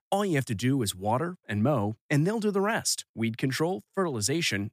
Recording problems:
none

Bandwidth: 15 kHz